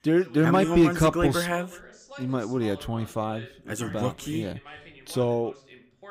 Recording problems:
voice in the background; faint; throughout; 20 dB below the speech

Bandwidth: 15.5 kHz